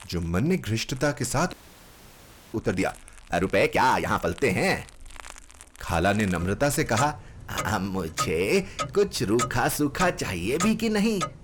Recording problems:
distortion; slight; 10 dB below the speech
household noises; loud; throughout; 9 dB below the speech
audio freezing; at 1.5 s for 1 s

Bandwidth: 18 kHz